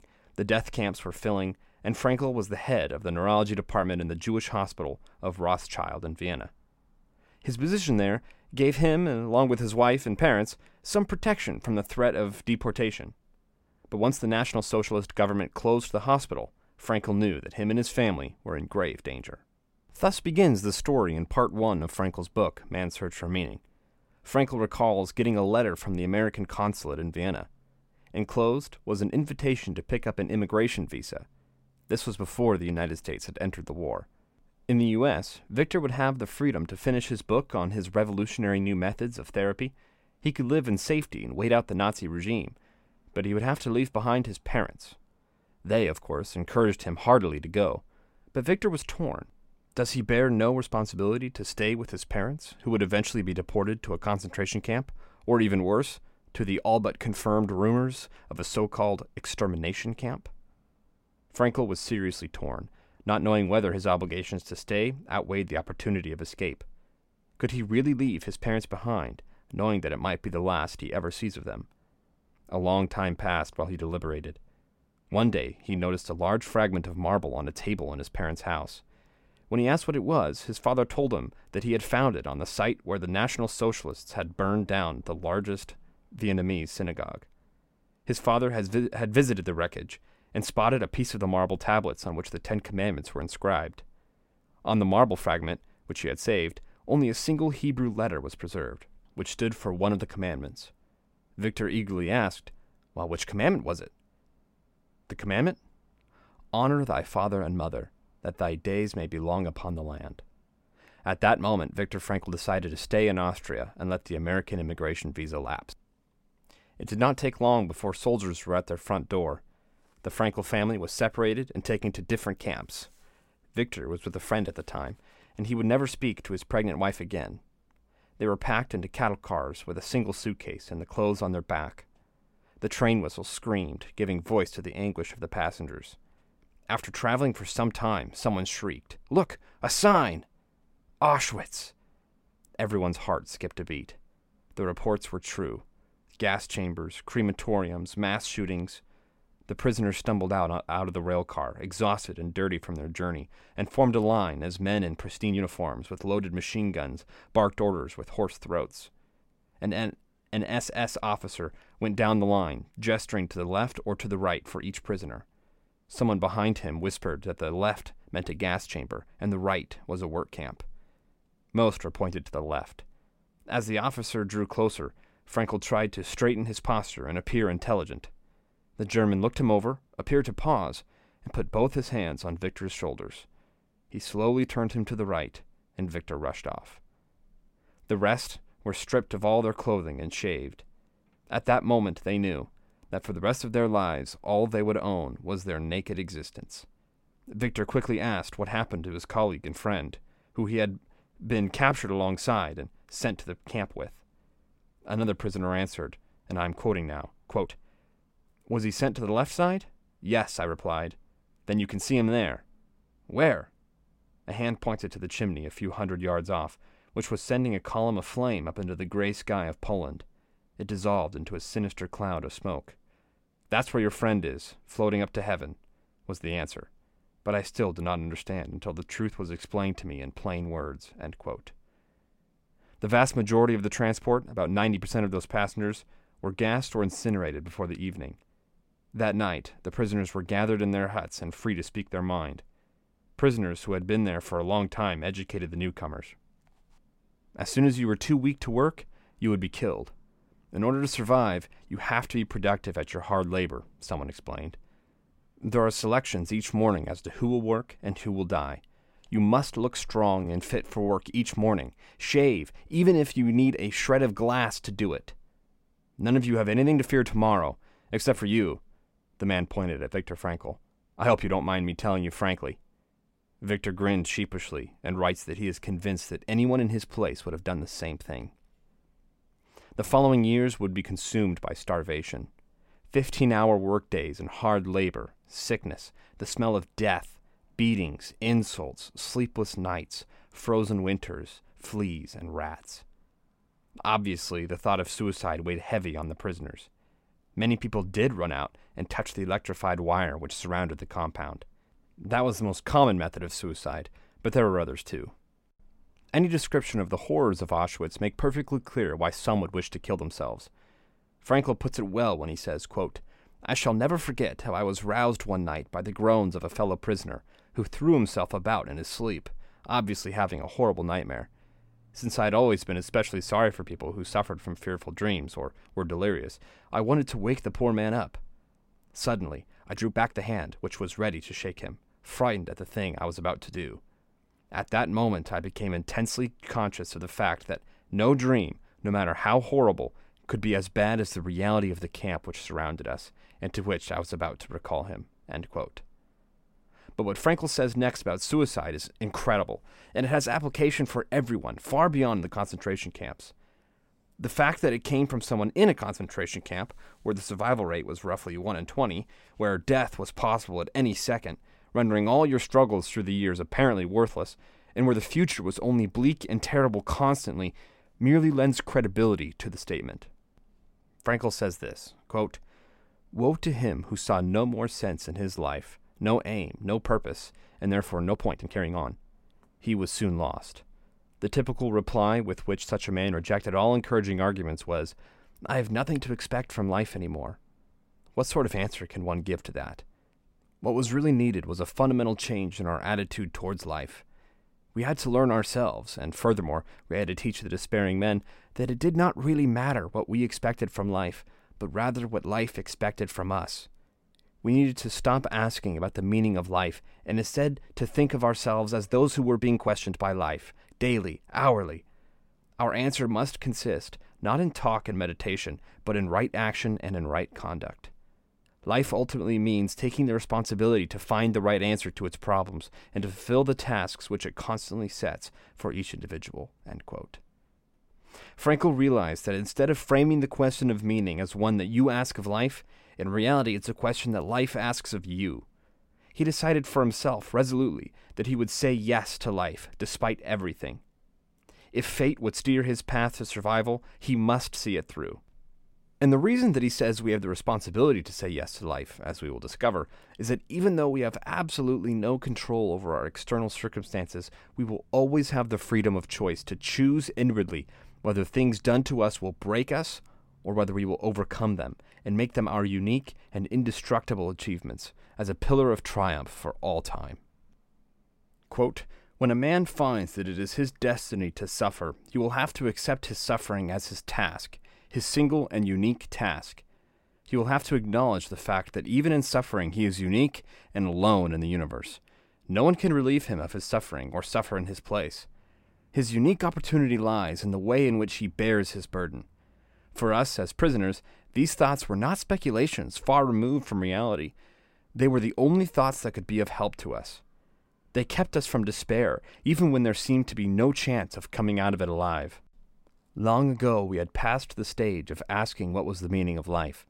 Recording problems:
uneven, jittery; strongly; from 14 s to 6:50

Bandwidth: 16 kHz